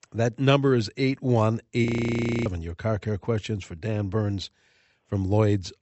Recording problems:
high frequencies cut off; noticeable; nothing above 8 kHz
audio freezing; at 2 s for 0.5 s

